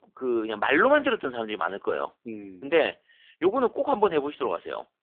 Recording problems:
phone-call audio; poor line

